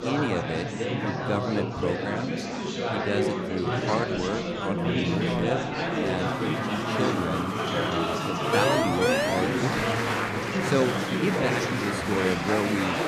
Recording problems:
chatter from many people; very loud; throughout; 3 dB above the speech
phone ringing; loud; at 4.5 s; peak 1 dB above the speech
siren; loud; at 8.5 s; peak 6 dB above the speech
doorbell; noticeable; from 11 to 12 s; peak 10 dB below the speech

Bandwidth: 14.5 kHz